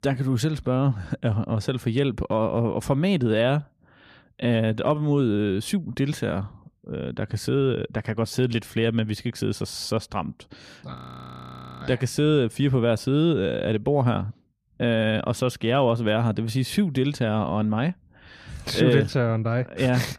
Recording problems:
audio freezing; at 11 s for 1 s

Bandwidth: 14.5 kHz